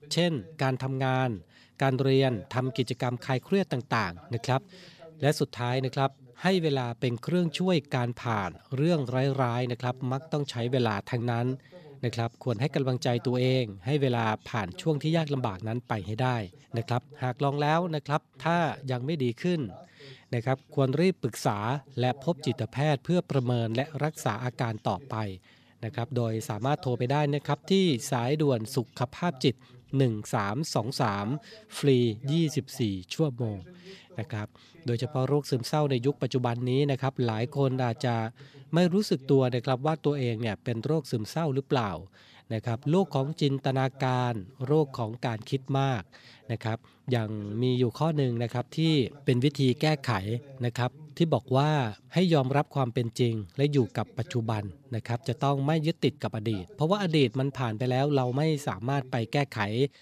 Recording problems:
voice in the background; faint; throughout; 25 dB below the speech

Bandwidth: 14.5 kHz